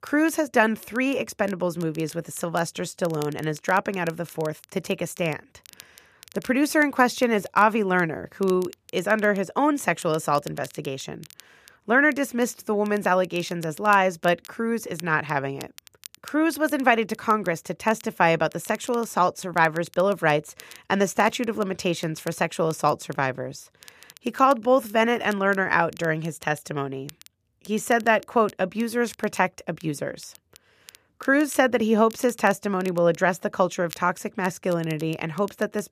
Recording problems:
crackle, like an old record; faint; 25 dB below the speech

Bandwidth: 14.5 kHz